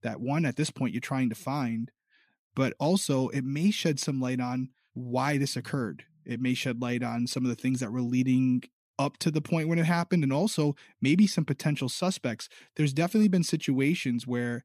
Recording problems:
none

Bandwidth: 14.5 kHz